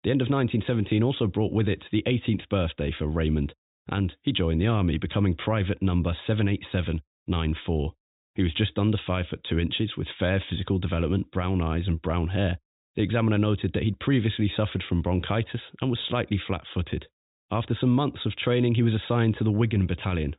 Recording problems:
high frequencies cut off; severe; nothing above 4 kHz

